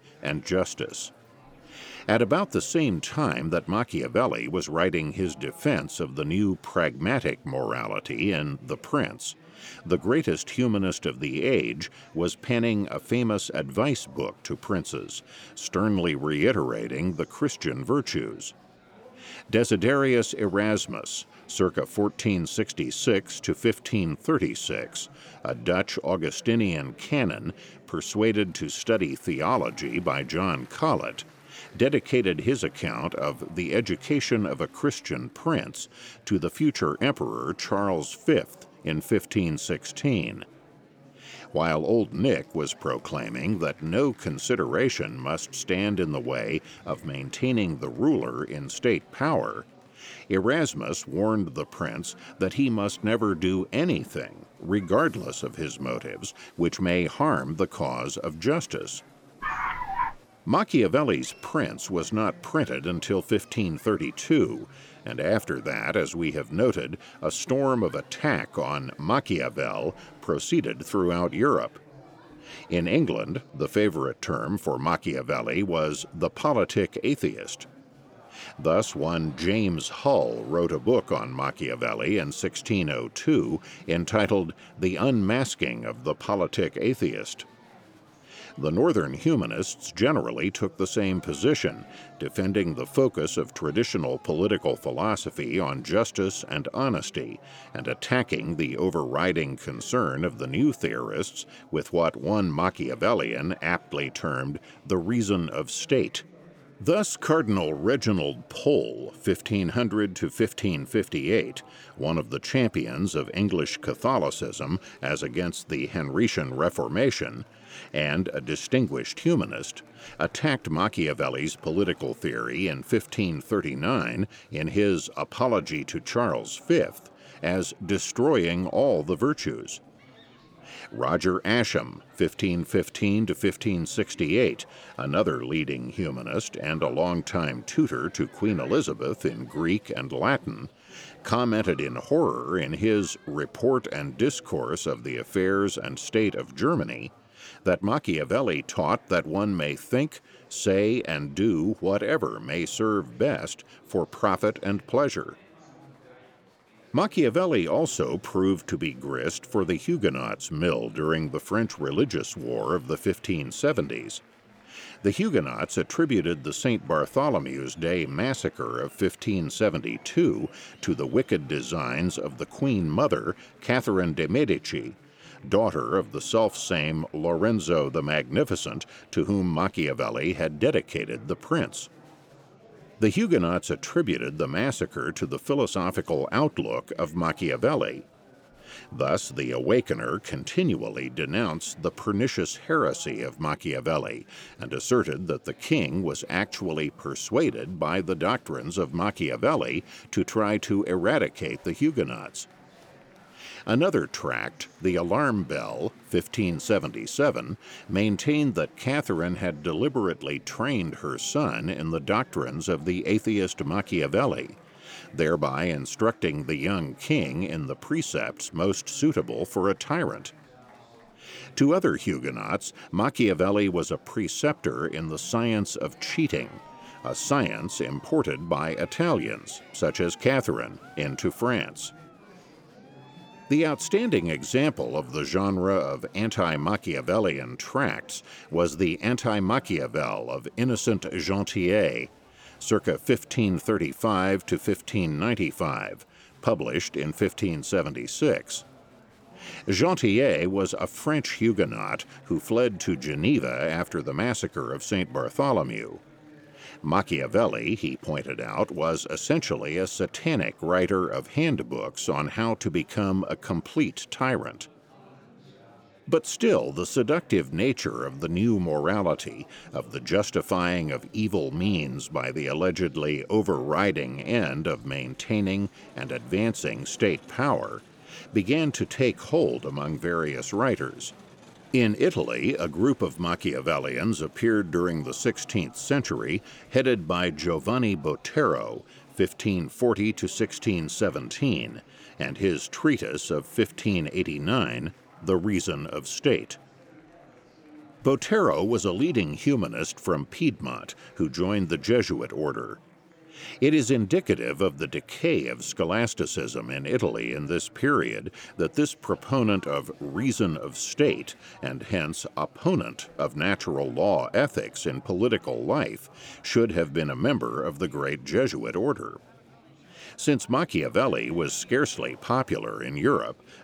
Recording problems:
chatter from many people; faint; throughout; 25 dB below the speech
dog barking; noticeable; at 59 s; peak 2 dB below the speech

